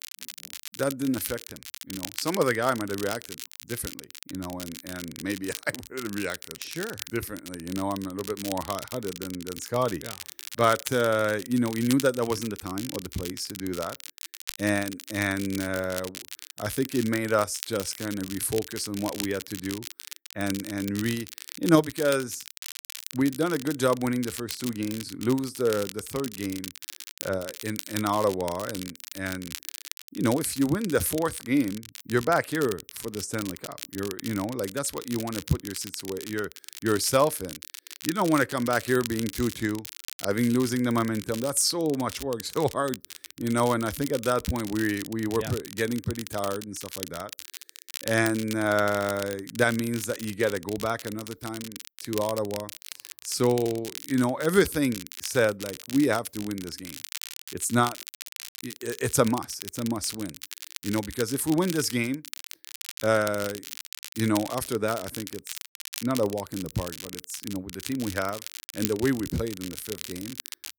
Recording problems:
crackle, like an old record; noticeable; 10 dB below the speech

